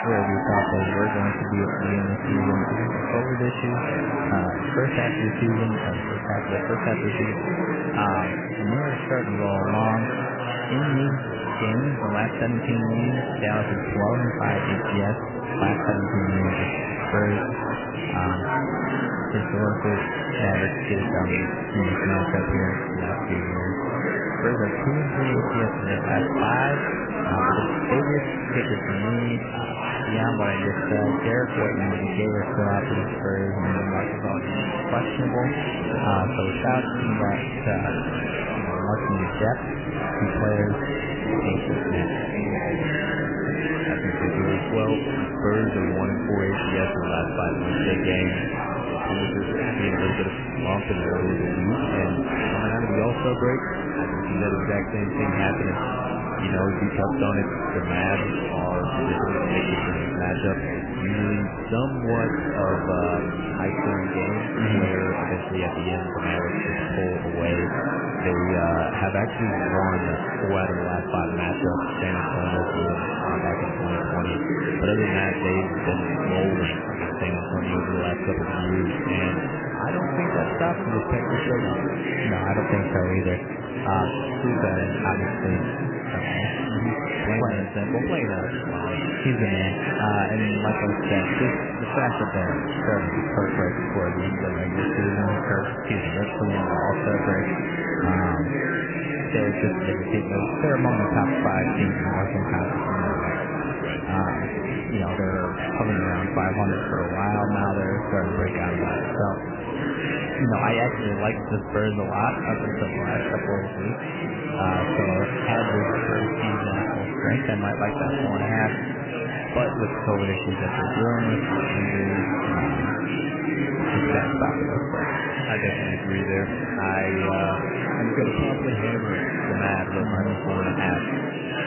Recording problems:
garbled, watery; badly; nothing above 3 kHz
murmuring crowd; very loud; throughout; 1 dB above the speech

